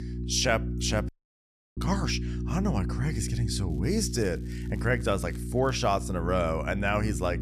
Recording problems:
electrical hum; noticeable; throughout; 60 Hz, 15 dB below the speech
crackling; faint; from 3.5 to 6 s; 30 dB below the speech
audio cutting out; at 1 s for 0.5 s

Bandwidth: 14 kHz